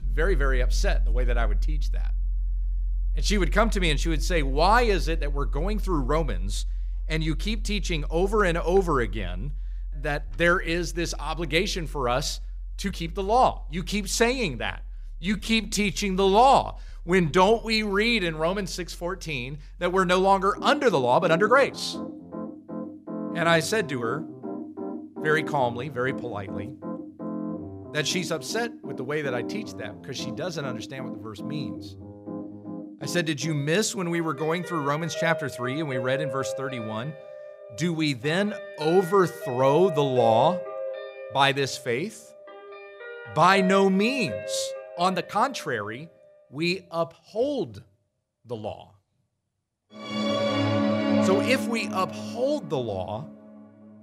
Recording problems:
background music; loud; throughout; 8 dB below the speech
uneven, jittery; strongly; from 10 to 48 s

